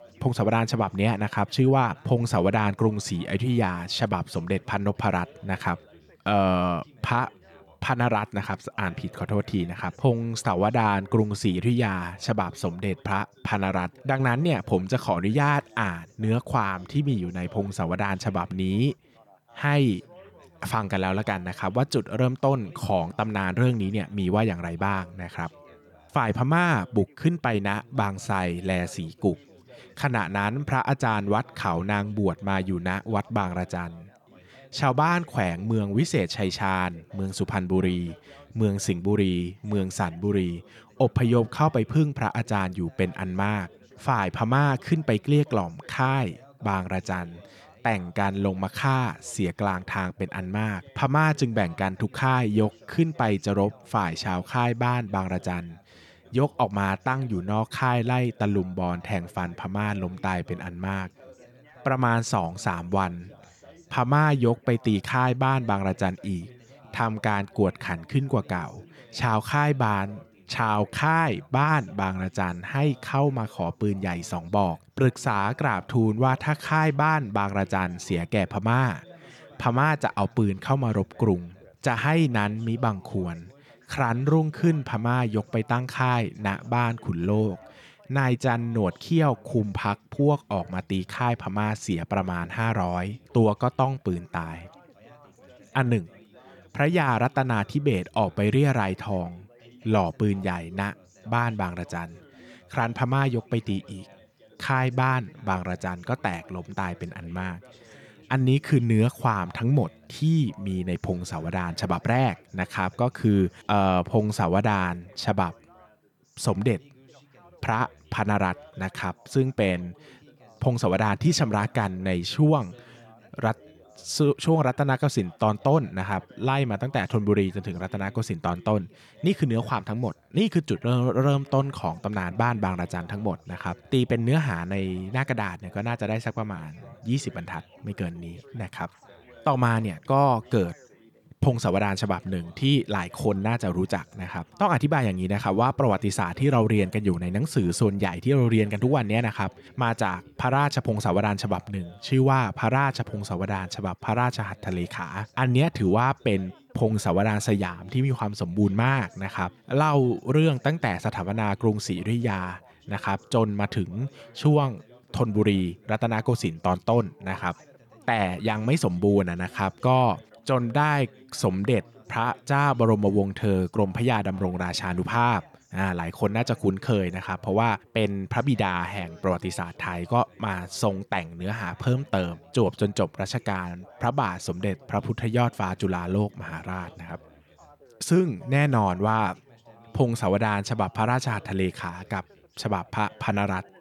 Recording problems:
background chatter; faint; throughout; 3 voices, 25 dB below the speech

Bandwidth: 18.5 kHz